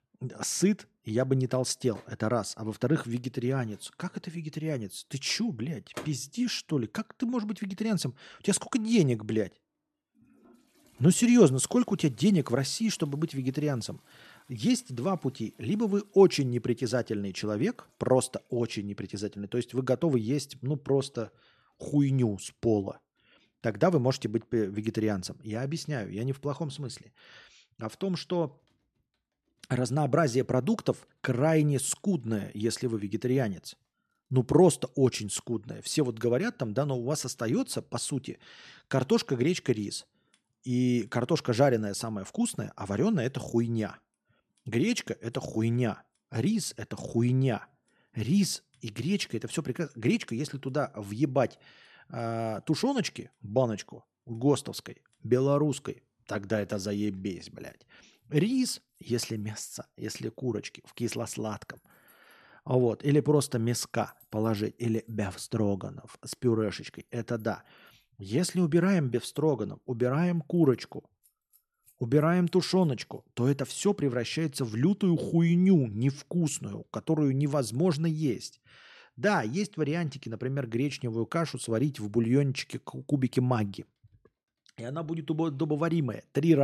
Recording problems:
household noises; faint; throughout; 30 dB below the speech
abrupt cut into speech; at the end

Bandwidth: 13.5 kHz